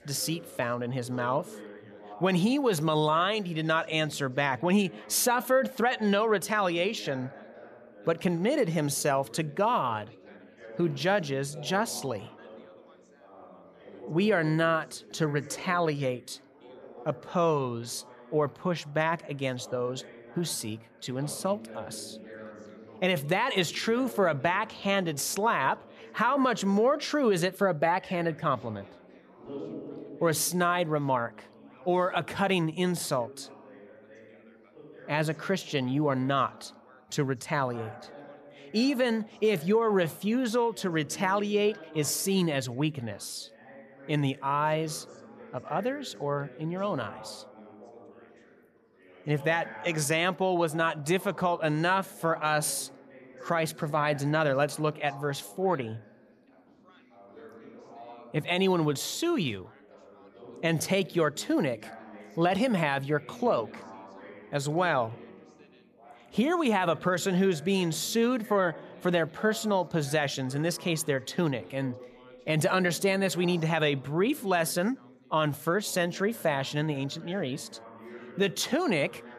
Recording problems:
background chatter; noticeable; throughout; 3 voices, 20 dB below the speech

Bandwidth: 14.5 kHz